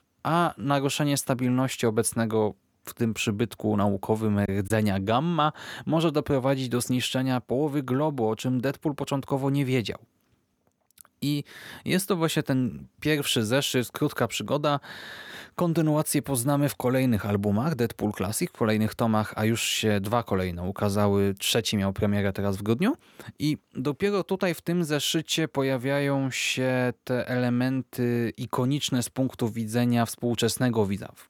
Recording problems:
choppy; occasionally; at 4.5 s; 4% of the speech affected

